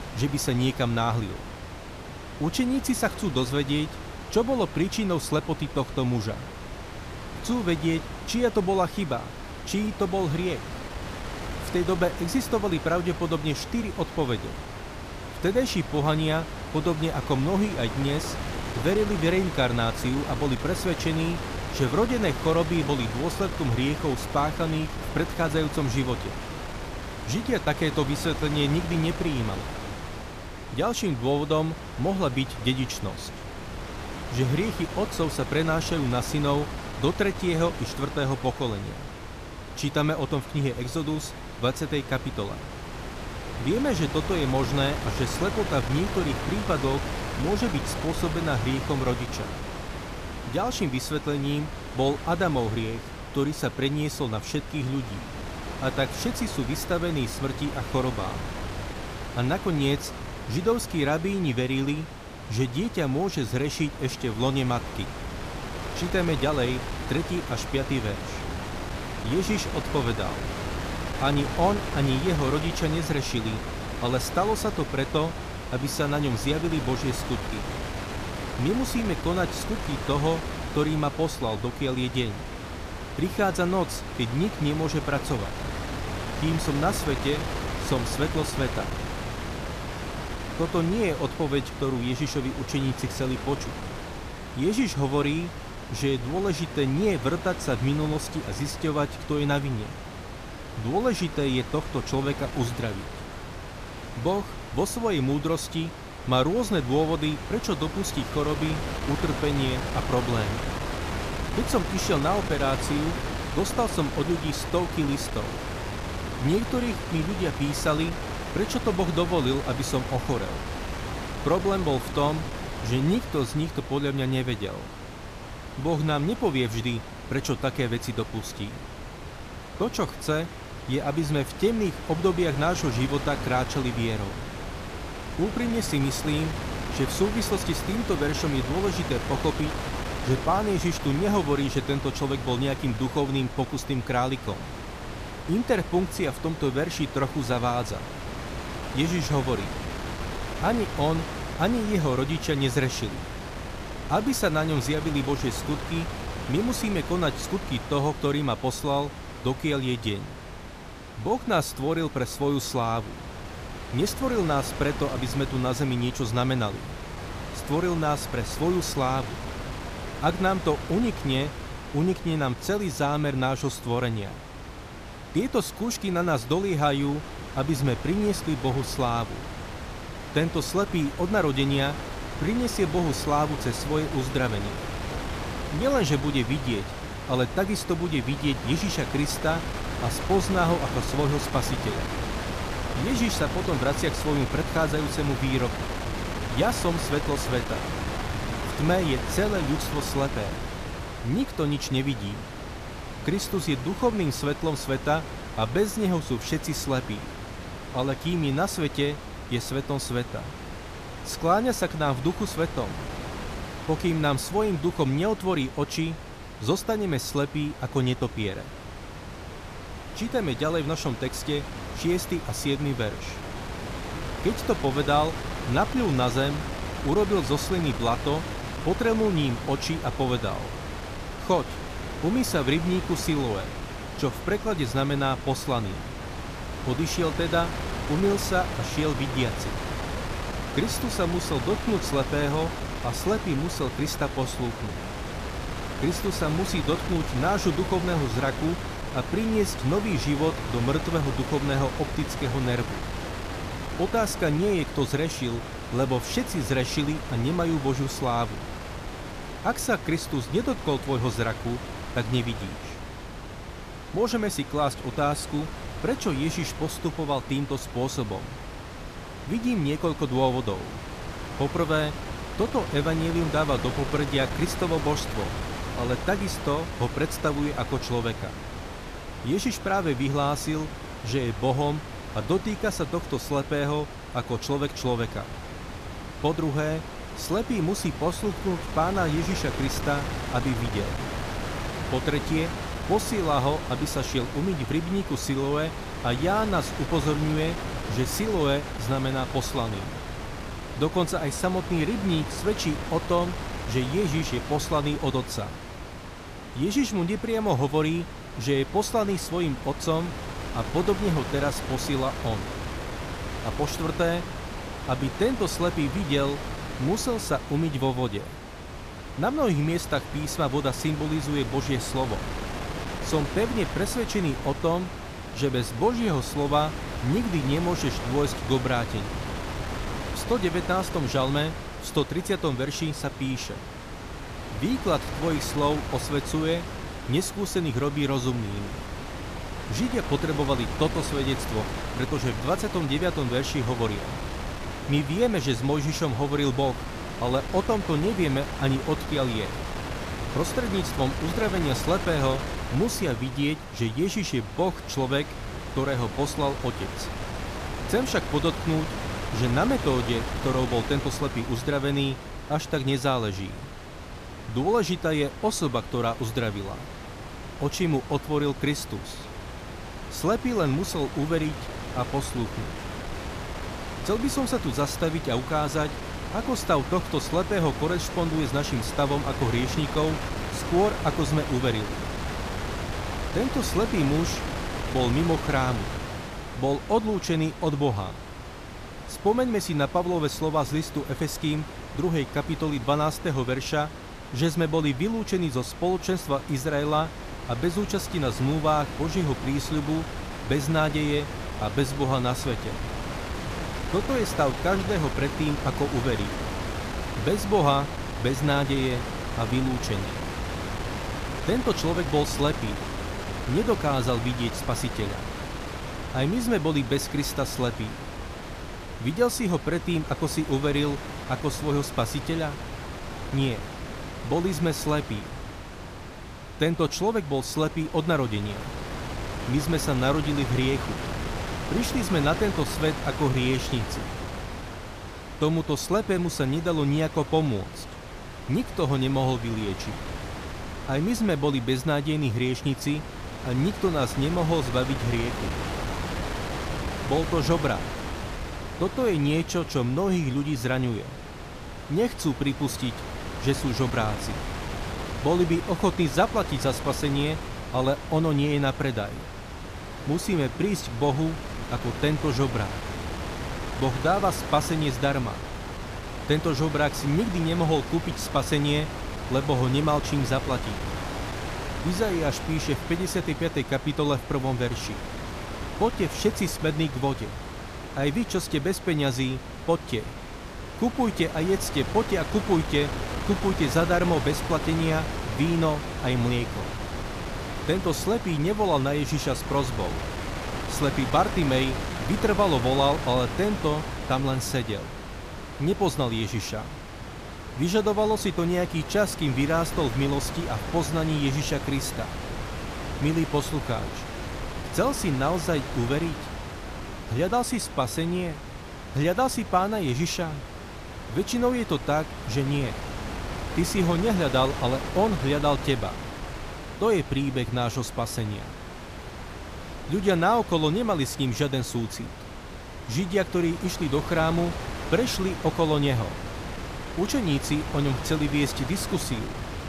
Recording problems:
wind noise on the microphone; heavy; 7 dB below the speech

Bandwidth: 14.5 kHz